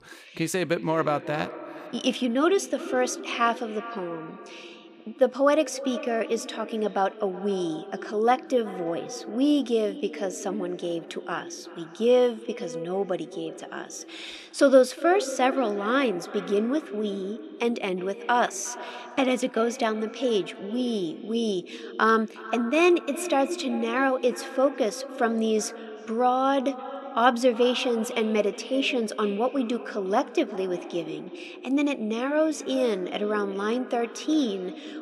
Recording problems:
echo of what is said; noticeable; throughout; 360 ms later, 15 dB below the speech

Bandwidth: 15 kHz